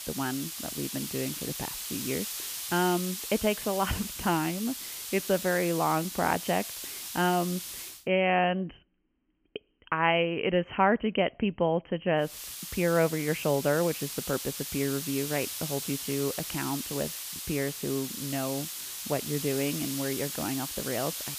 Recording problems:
high frequencies cut off; severe; nothing above 3 kHz
hiss; loud; until 8 s and from 12 s on; 5 dB below the speech

